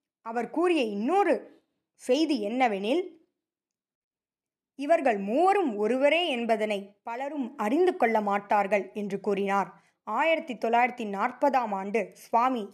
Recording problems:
none

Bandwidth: 13.5 kHz